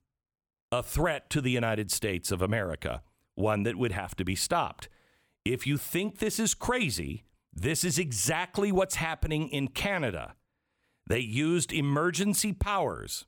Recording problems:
none

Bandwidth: 18 kHz